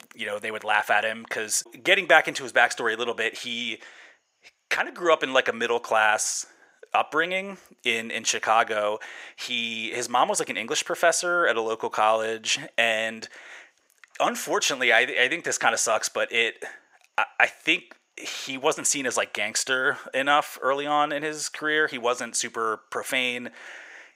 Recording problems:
thin; very; fading below 600 Hz

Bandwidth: 15.5 kHz